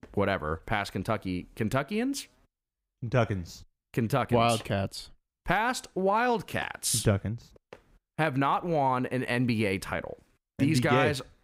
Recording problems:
none

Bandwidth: 15.5 kHz